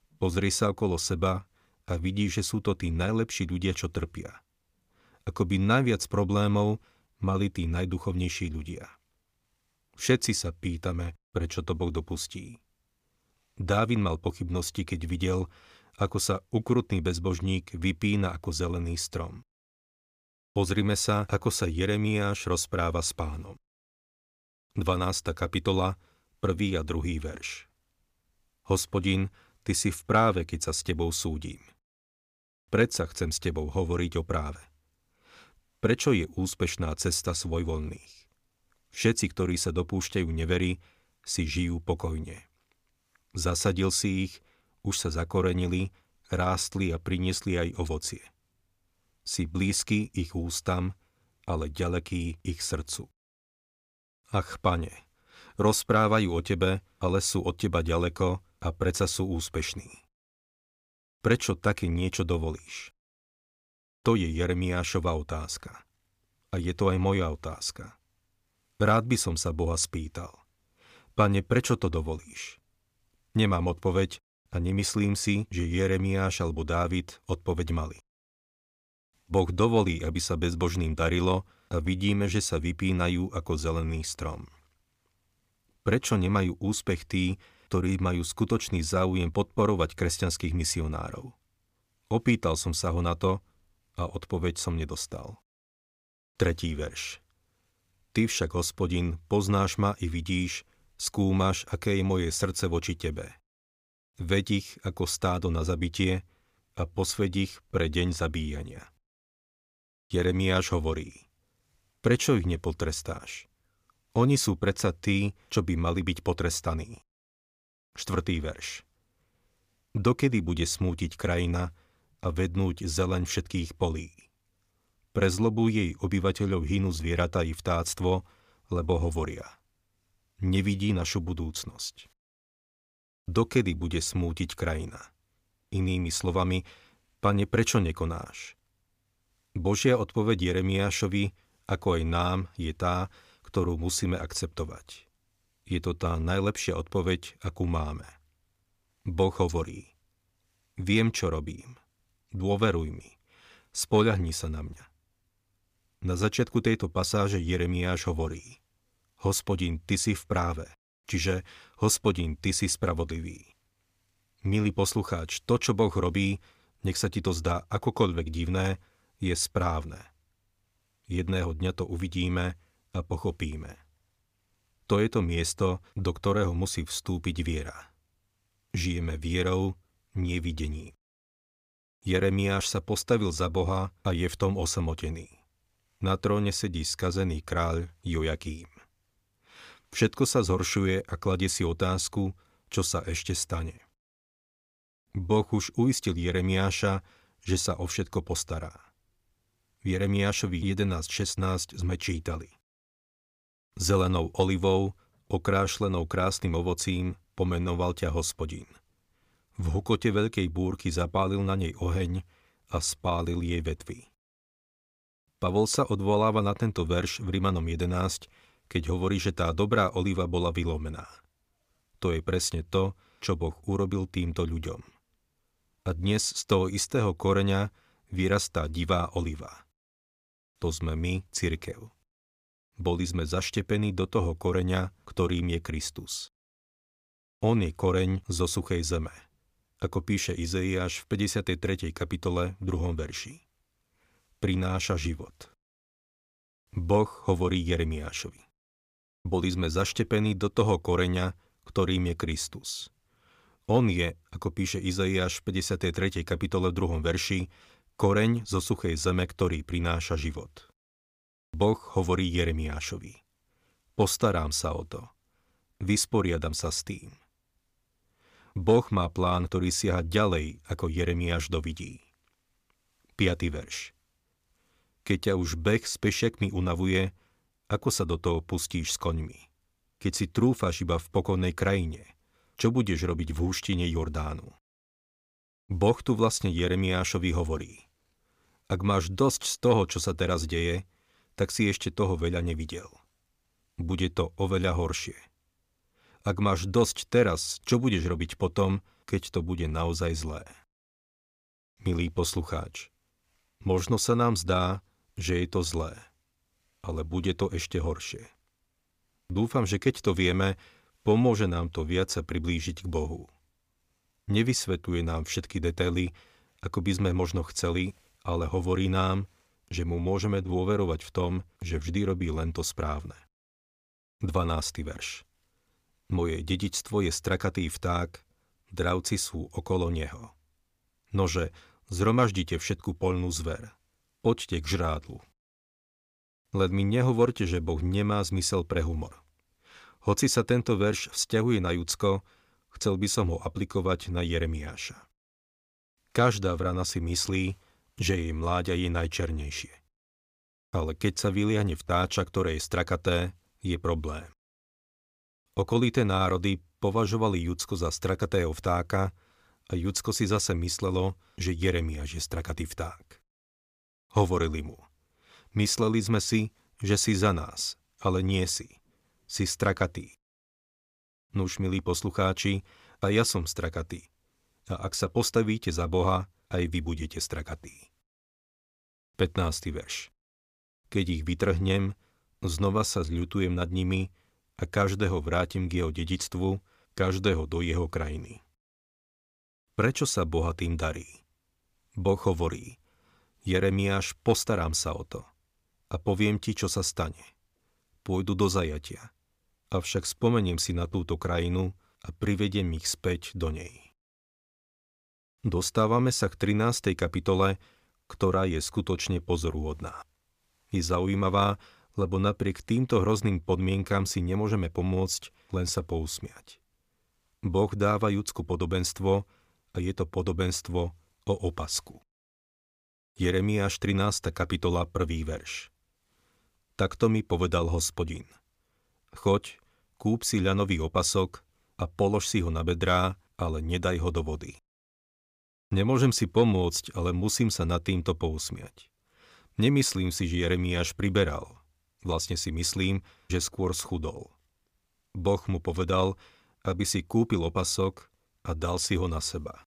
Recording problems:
none

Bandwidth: 15 kHz